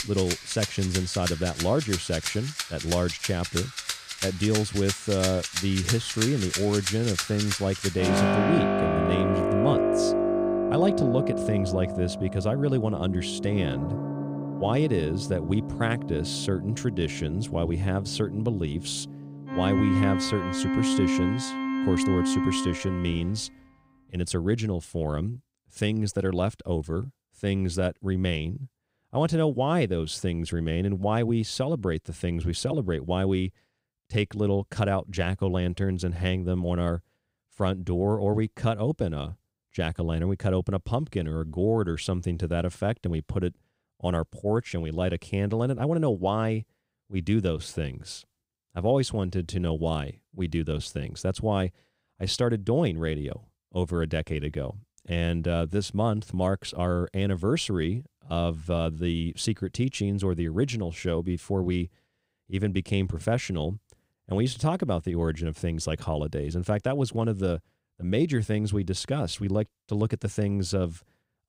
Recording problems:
background music; loud; until 23 s; 1 dB below the speech

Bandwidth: 15.5 kHz